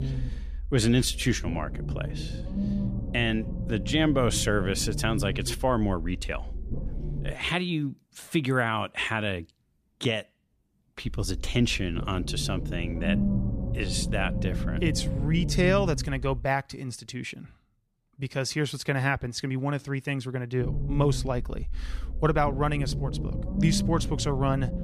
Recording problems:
low rumble; noticeable; until 7.5 s, from 11 to 16 s and from 21 s on; 10 dB below the speech

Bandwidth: 14.5 kHz